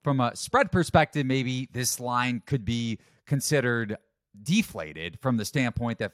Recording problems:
none

